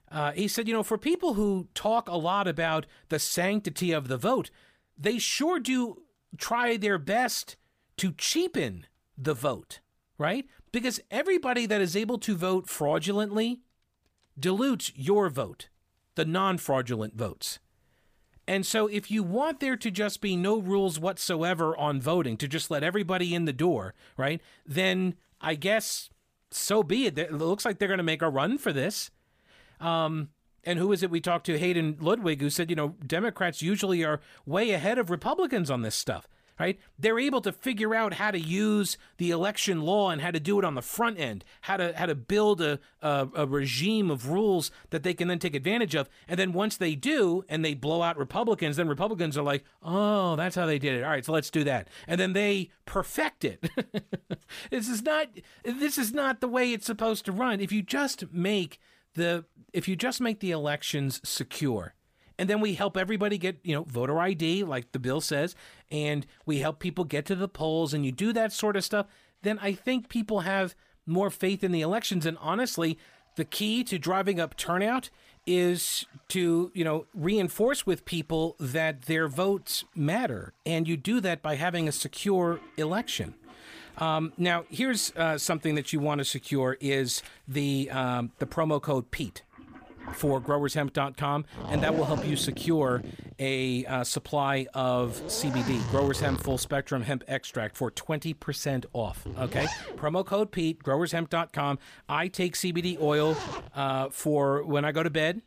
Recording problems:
household noises; noticeable; throughout; 10 dB below the speech

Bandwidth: 15 kHz